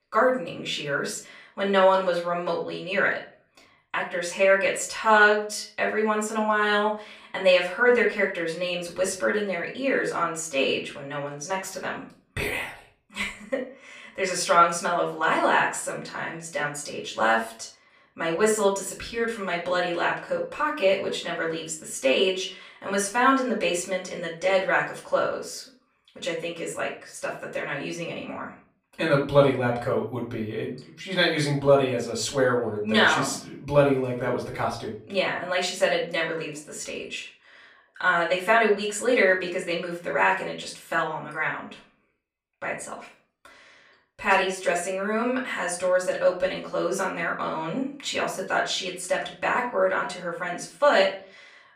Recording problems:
off-mic speech; far
room echo; slight; dies away in 0.3 s

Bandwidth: 15 kHz